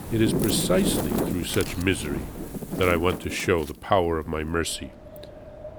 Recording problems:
wind in the background; loud; throughout; 4 dB below the speech

